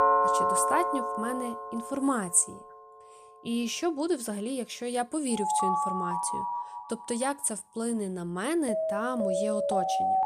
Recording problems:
alarms or sirens; very loud; throughout; 1 dB above the speech

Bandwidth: 15 kHz